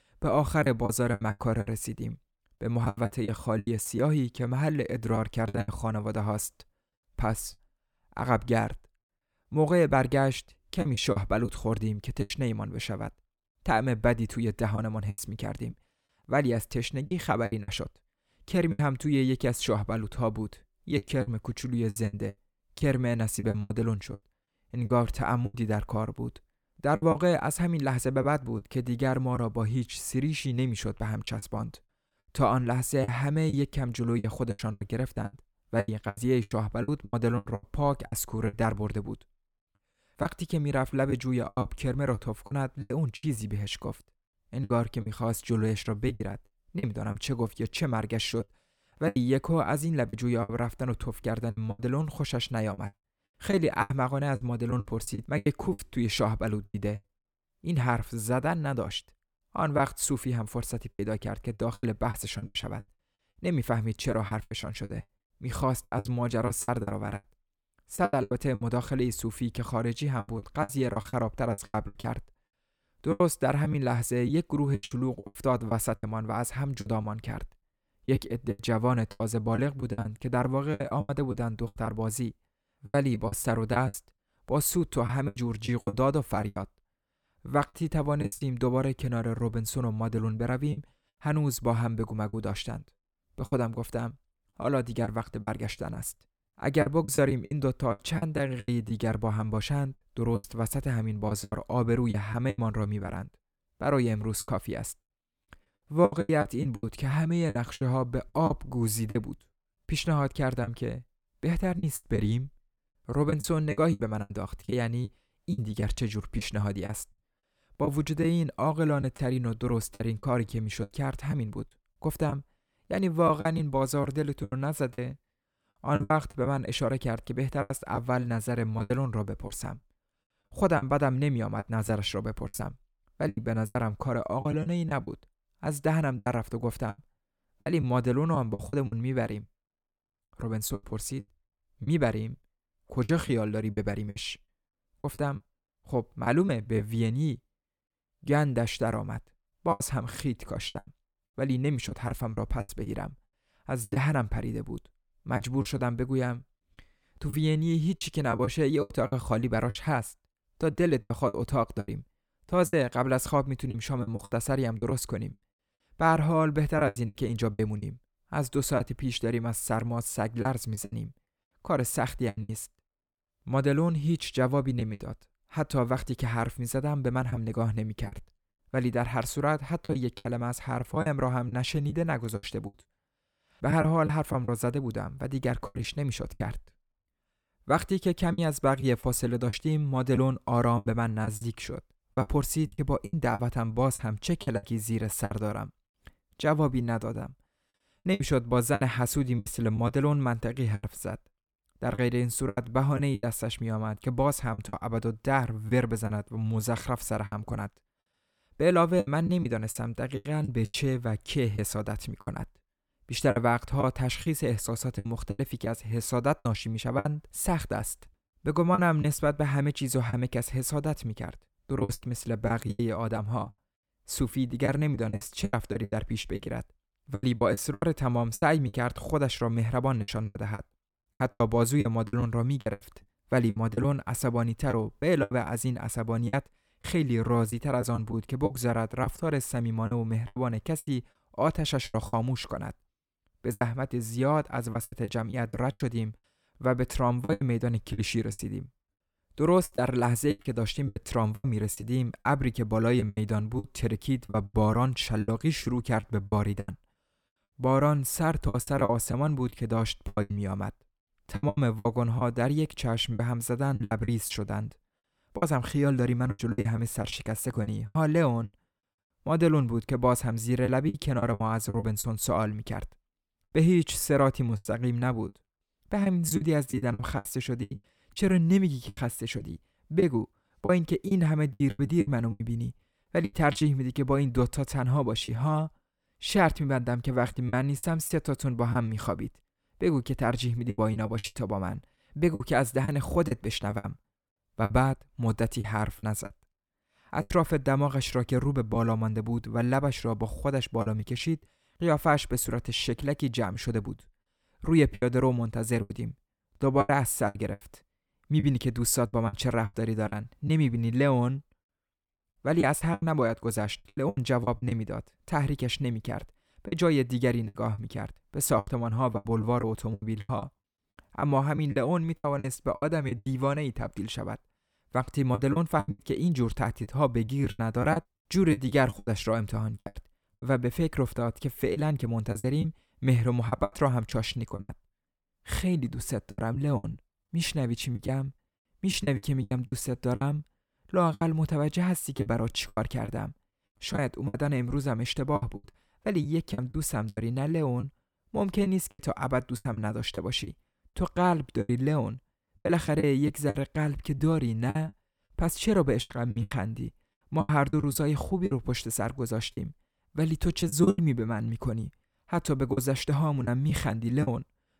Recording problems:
choppy; very; 10% of the speech affected

